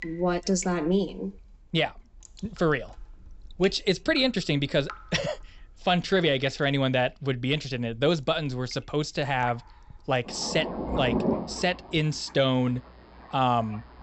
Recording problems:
high frequencies cut off; noticeable; nothing above 8 kHz
rain or running water; loud; throughout; 10 dB below the speech

